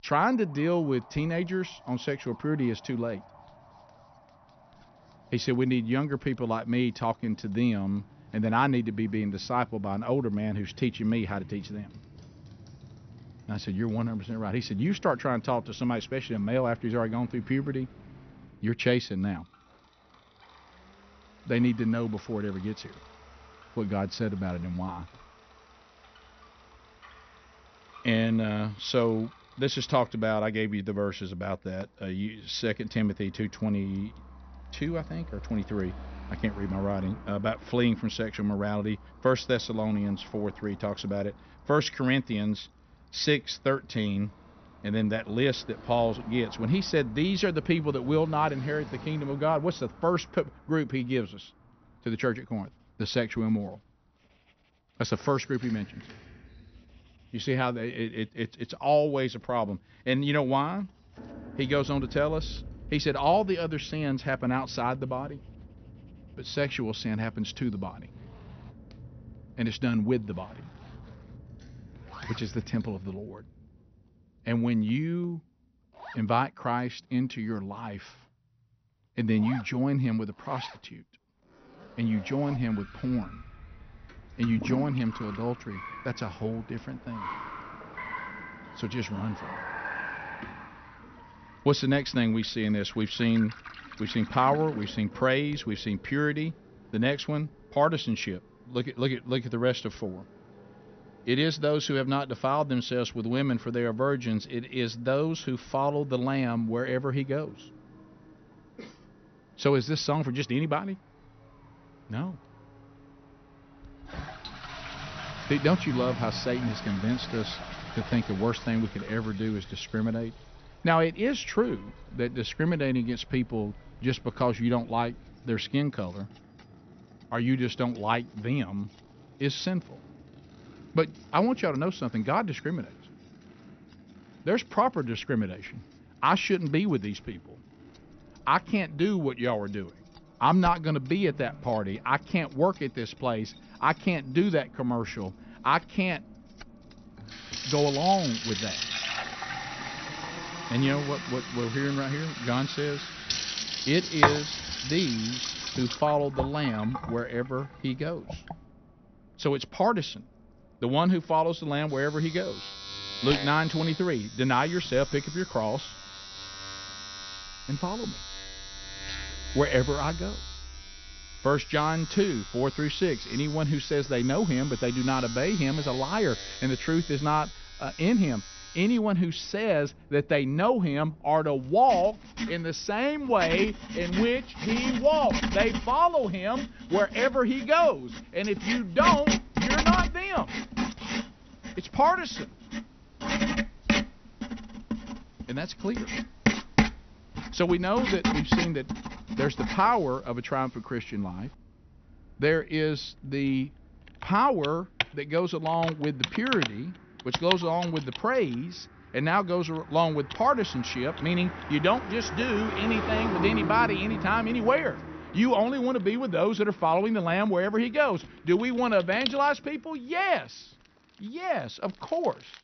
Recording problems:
high frequencies cut off; noticeable; nothing above 6 kHz
household noises; loud; throughout; 6 dB below the speech
traffic noise; noticeable; throughout; 20 dB below the speech

